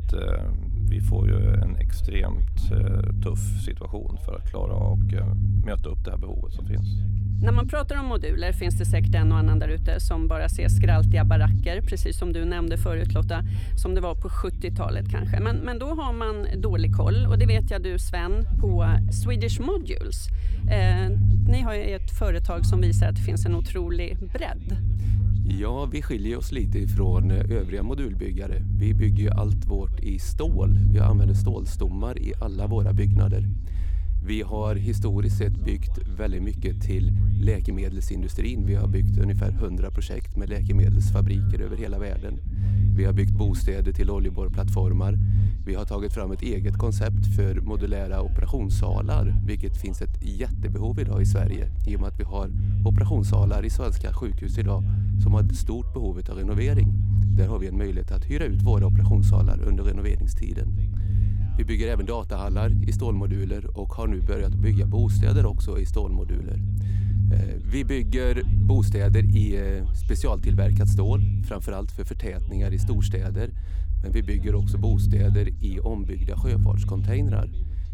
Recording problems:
low rumble; loud; throughout; 4 dB below the speech
voice in the background; faint; throughout; 25 dB below the speech

